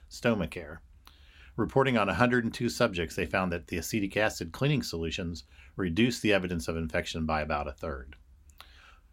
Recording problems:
none

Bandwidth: 16 kHz